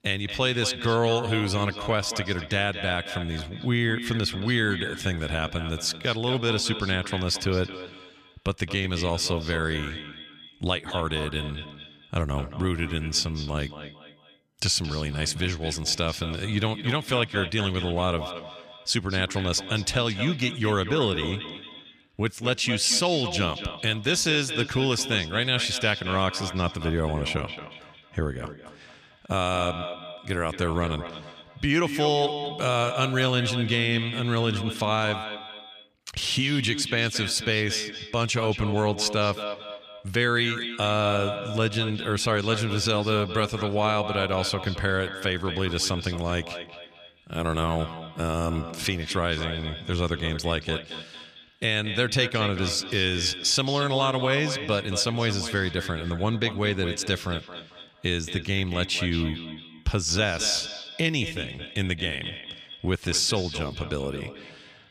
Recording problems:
echo of what is said; strong; throughout; 220 ms later, 9 dB below the speech

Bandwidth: 14.5 kHz